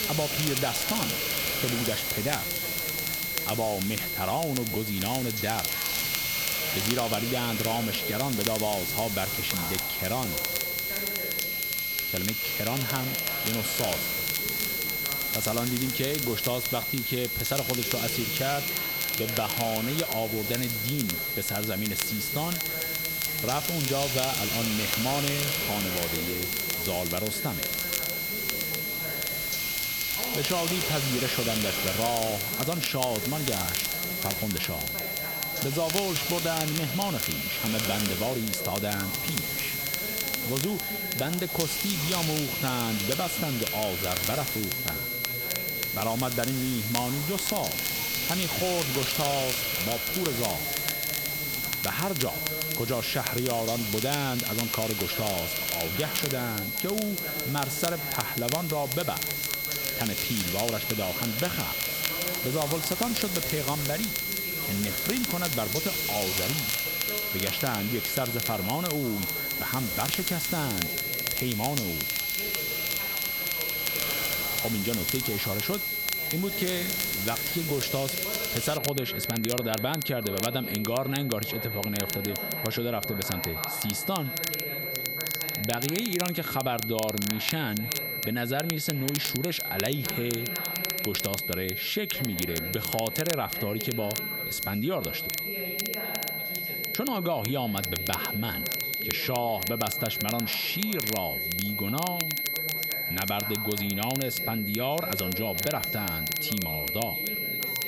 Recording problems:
squashed, flat; somewhat
high-pitched whine; loud; throughout; 2 kHz, as loud as the speech
hiss; loud; until 1:19; 2 dB below the speech
crackle, like an old record; loud; 4 dB below the speech
background chatter; noticeable; throughout; 3 voices, 10 dB below the speech

